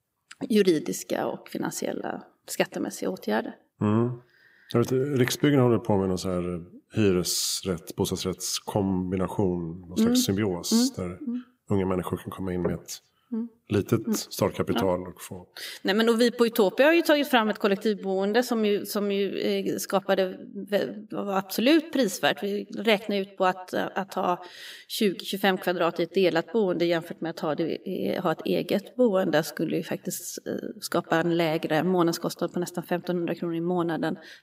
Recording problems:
echo of what is said; faint; throughout; 120 ms later, 25 dB below the speech

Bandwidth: 15.5 kHz